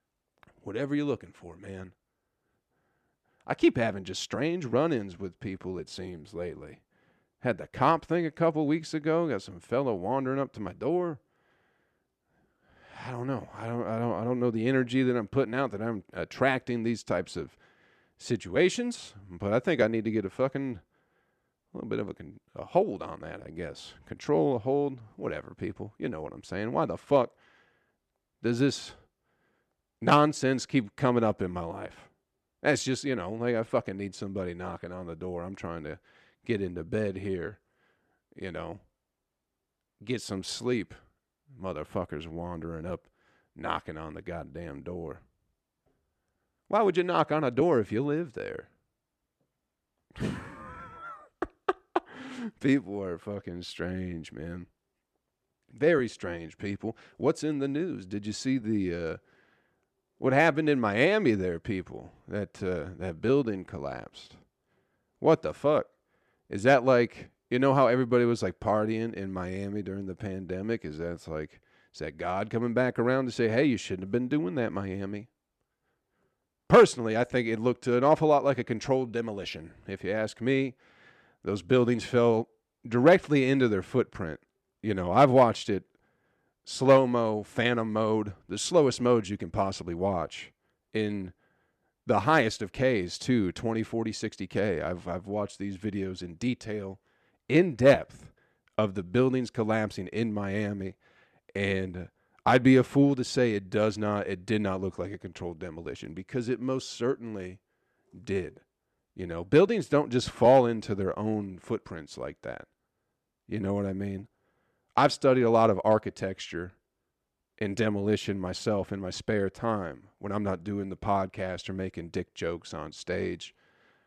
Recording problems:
none

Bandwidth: 13.5 kHz